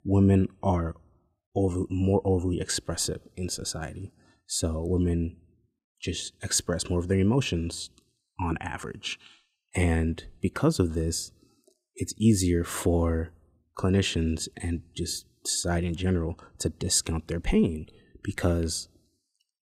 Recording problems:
none

